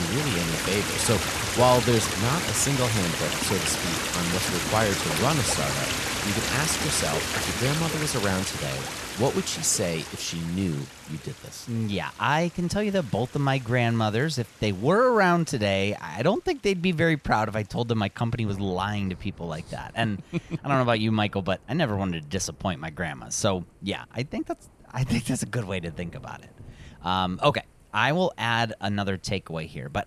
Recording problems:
rain or running water; loud; throughout; 1 dB below the speech
abrupt cut into speech; at the start

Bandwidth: 13.5 kHz